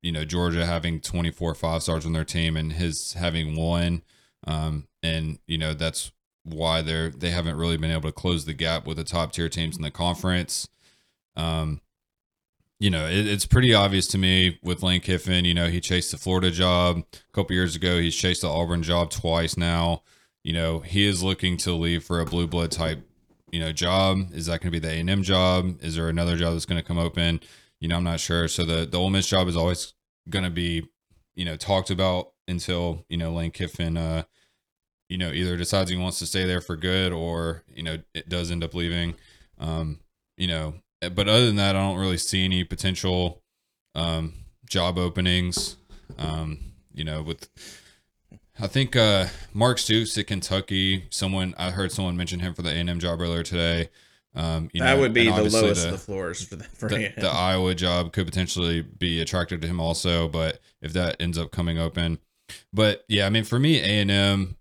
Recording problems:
none

